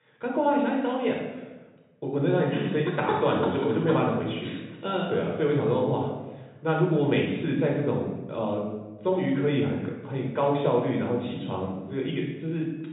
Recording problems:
off-mic speech; far
high frequencies cut off; severe; nothing above 4 kHz
room echo; noticeable; dies away in 1 s

